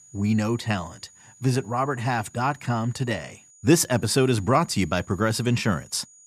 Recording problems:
high-pitched whine; faint; throughout; 7 kHz, 25 dB below the speech

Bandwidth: 14.5 kHz